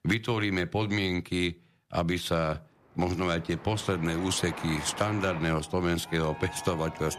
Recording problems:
train or aircraft noise; noticeable; from 3 s on; 15 dB below the speech

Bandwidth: 14.5 kHz